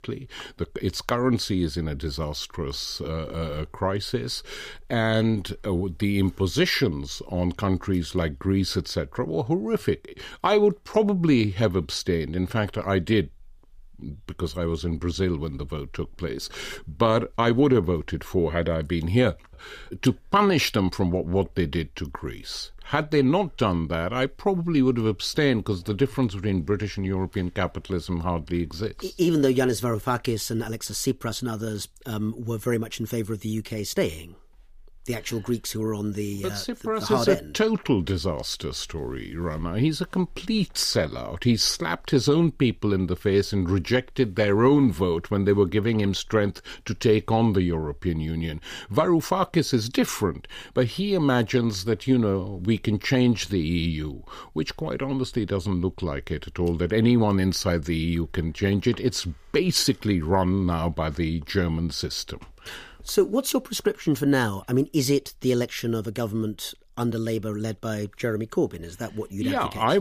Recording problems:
abrupt cut into speech; at the end

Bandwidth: 15 kHz